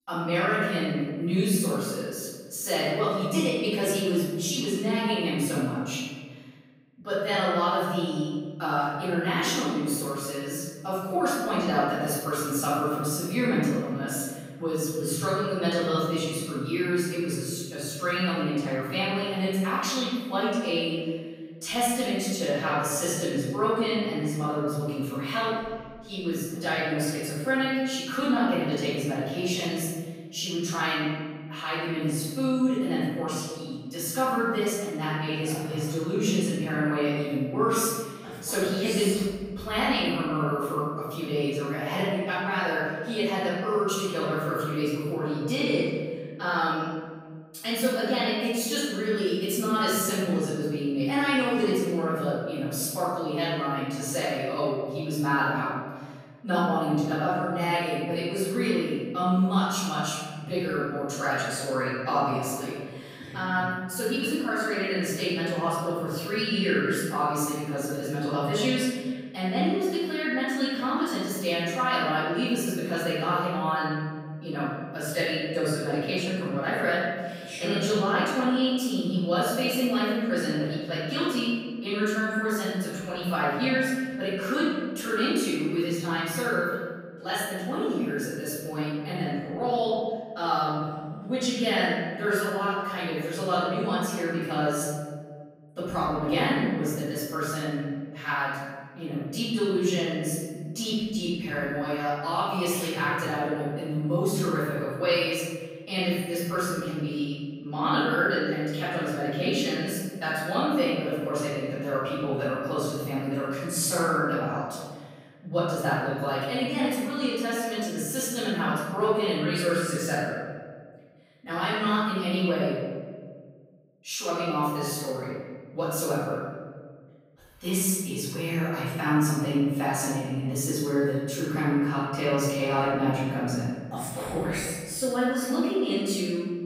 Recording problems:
room echo; strong; dies away in 1.5 s
off-mic speech; far

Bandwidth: 15.5 kHz